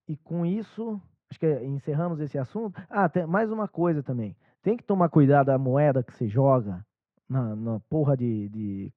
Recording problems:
muffled; very; fading above 1.5 kHz

